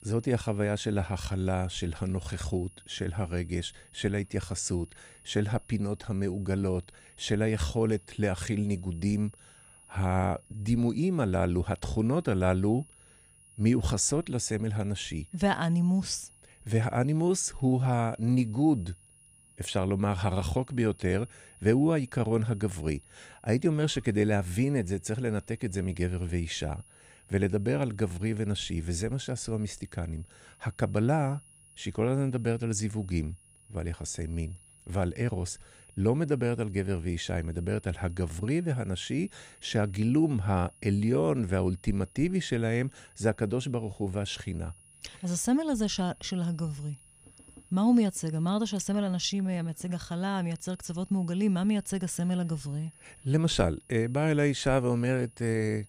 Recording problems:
high-pitched whine; faint; throughout; 10.5 kHz, 25 dB below the speech

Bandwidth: 15.5 kHz